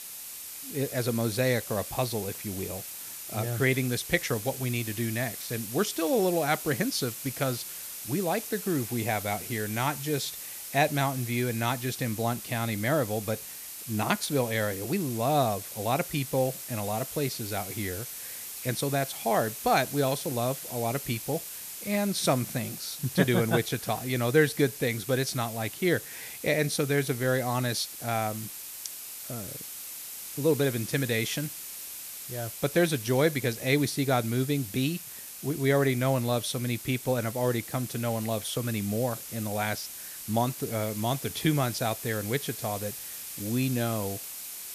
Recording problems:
hiss; loud; throughout; 8 dB below the speech

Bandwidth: 14.5 kHz